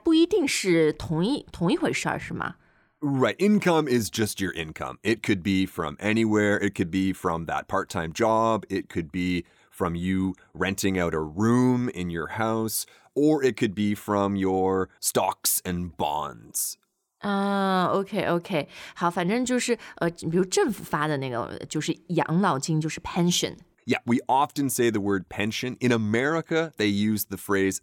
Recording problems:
none

